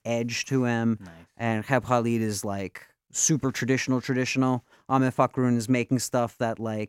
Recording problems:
none

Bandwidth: 16.5 kHz